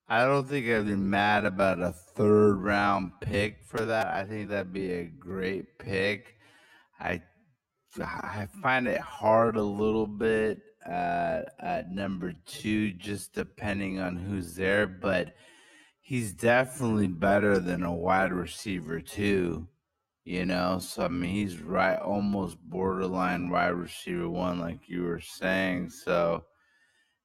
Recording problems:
wrong speed, natural pitch; too slow; 0.5 times normal speed

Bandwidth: 16 kHz